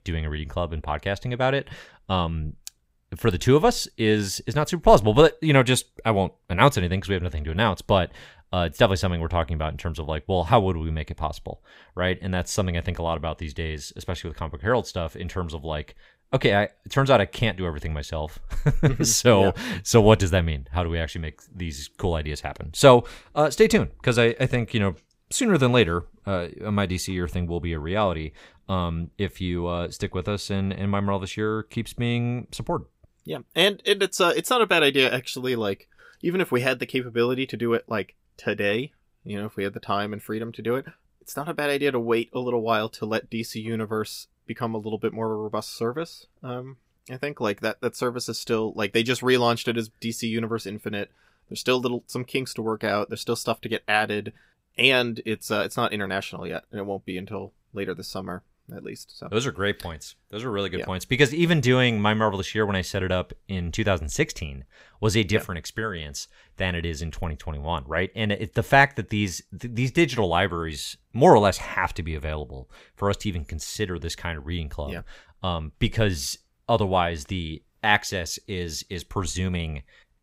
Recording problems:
none

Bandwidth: 15.5 kHz